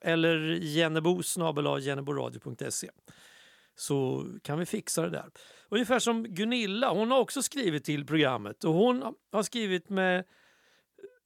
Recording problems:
none

